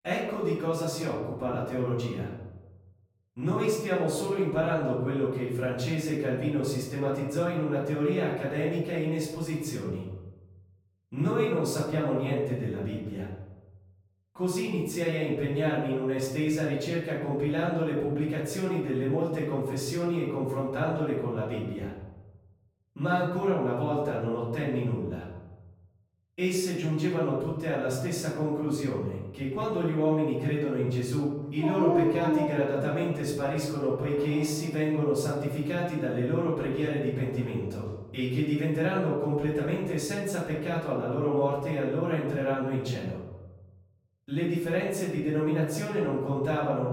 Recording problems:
off-mic speech; far
room echo; noticeable; dies away in 0.9 s
dog barking; loud; from 32 to 35 s; peak 4 dB above the speech

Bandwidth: 16 kHz